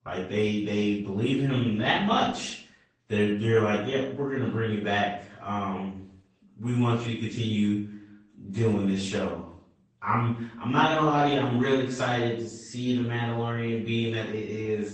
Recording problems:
off-mic speech; far
room echo; noticeable; dies away in 0.5 s
garbled, watery; slightly; nothing above 8 kHz

